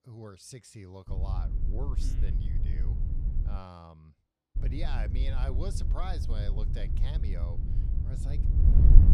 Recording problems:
wind noise on the microphone; heavy; from 1 to 3.5 s and from 4.5 s on; 2 dB below the speech

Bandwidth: 14.5 kHz